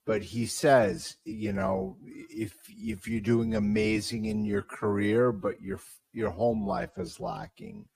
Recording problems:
wrong speed, natural pitch; too slow; 0.6 times normal speed

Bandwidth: 15 kHz